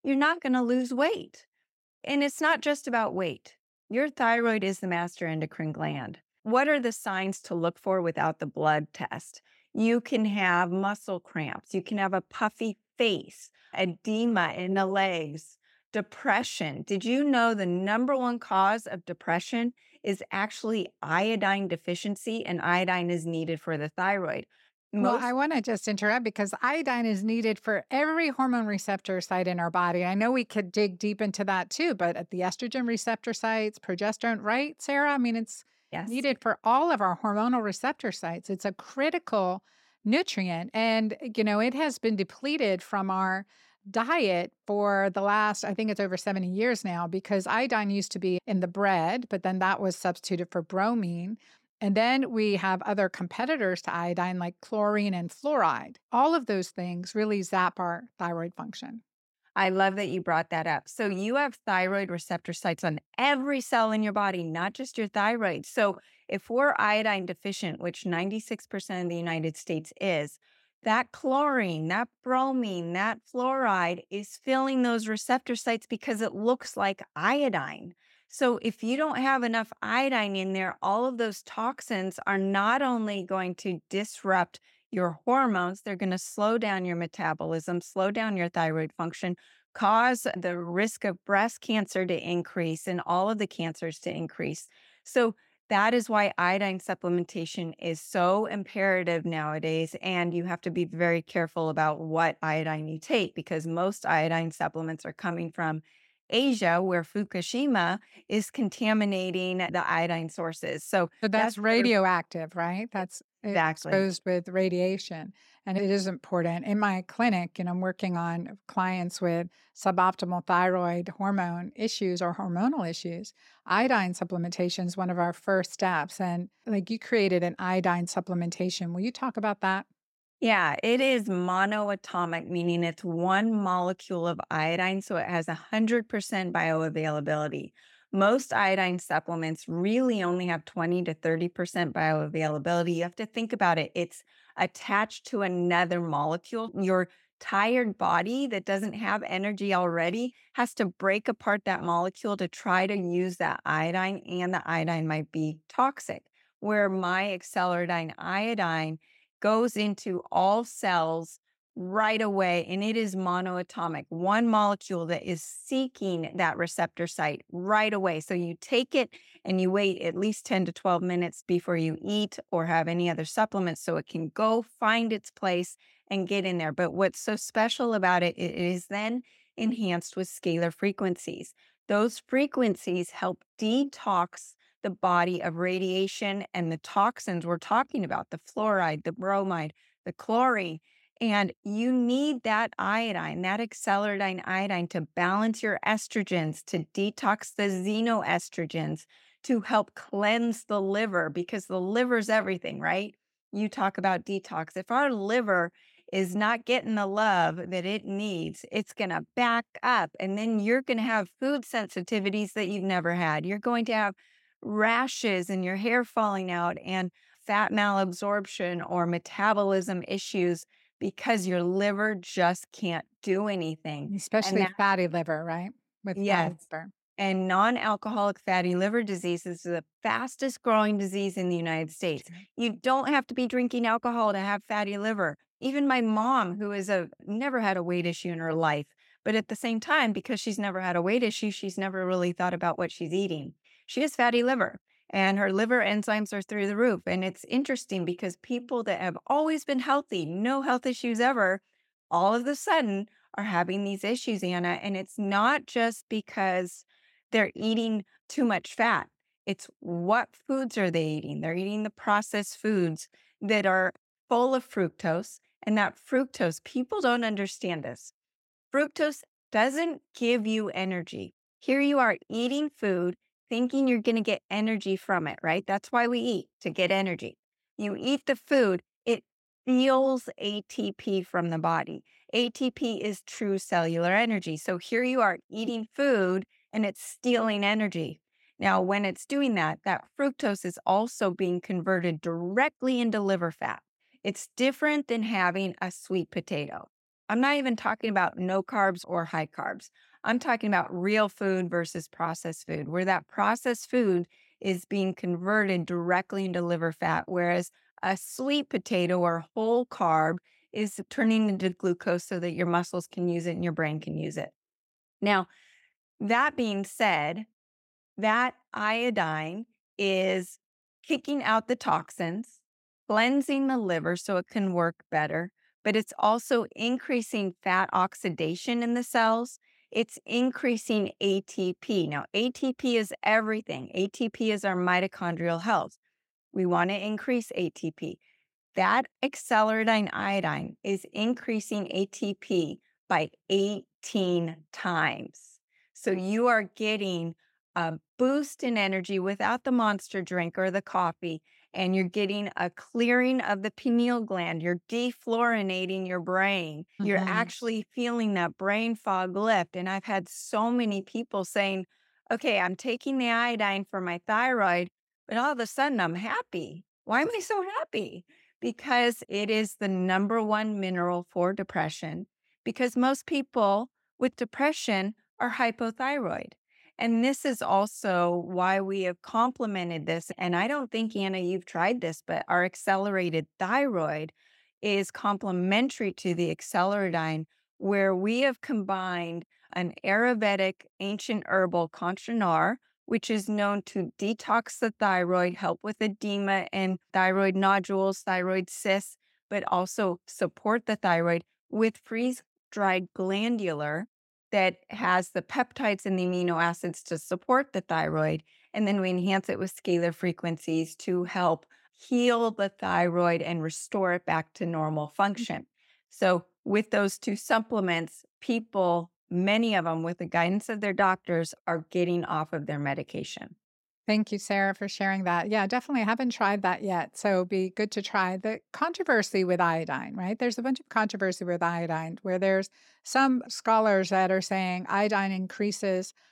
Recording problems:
none

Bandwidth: 16.5 kHz